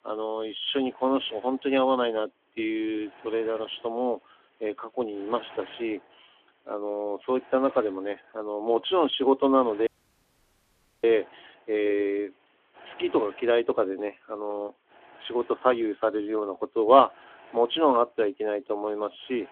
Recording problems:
phone-call audio; nothing above 3.5 kHz
hiss; faint; throughout; 25 dB below the speech
audio cutting out; at 10 s for 1 s

